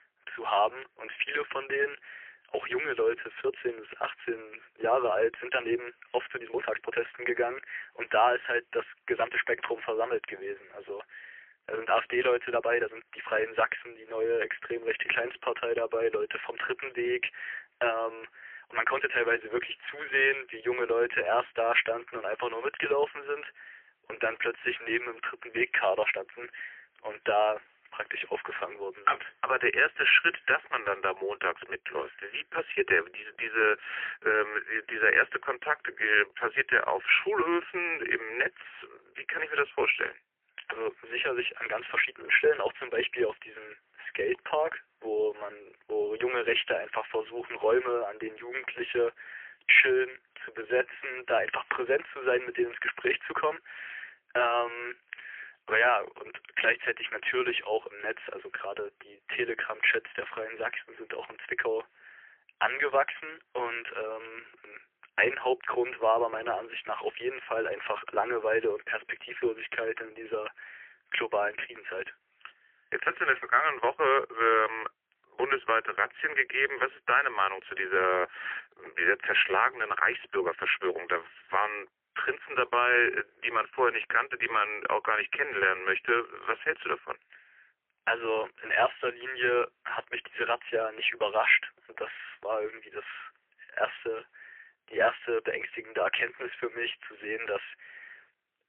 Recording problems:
phone-call audio; poor line; nothing above 3 kHz
thin; very; fading below 300 Hz
uneven, jittery; strongly; from 4.5 s to 1:21

